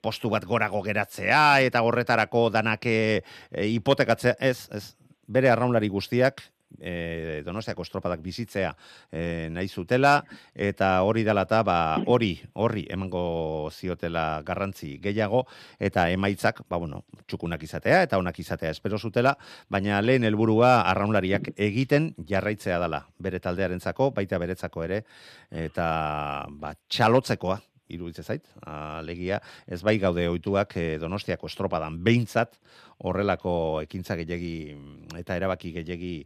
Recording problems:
none

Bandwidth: 14.5 kHz